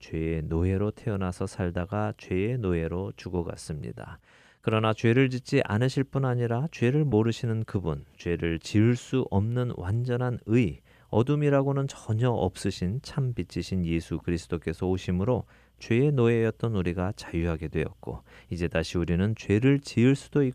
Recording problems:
none

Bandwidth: 14.5 kHz